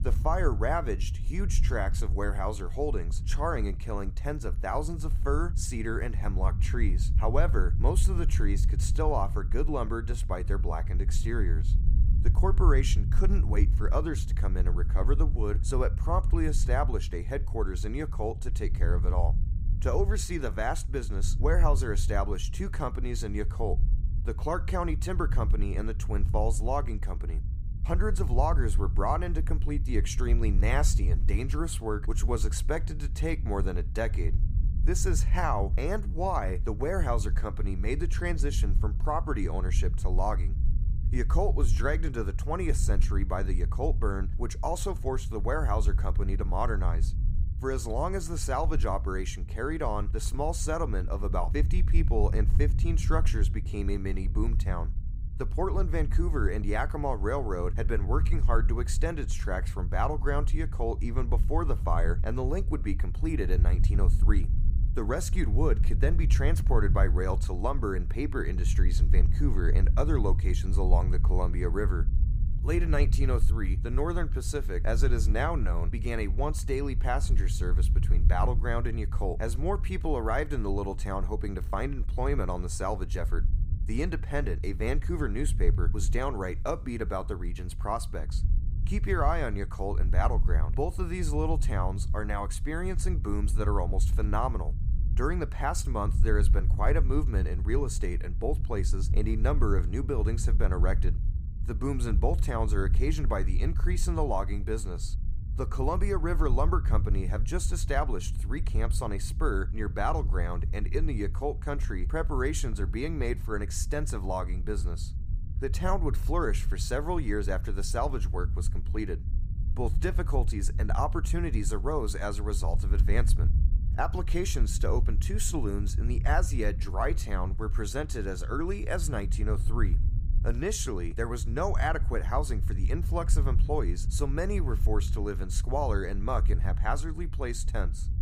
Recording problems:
low rumble; noticeable; throughout; 15 dB below the speech

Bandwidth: 15.5 kHz